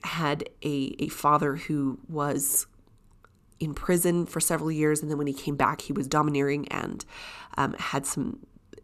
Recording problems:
none

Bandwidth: 14.5 kHz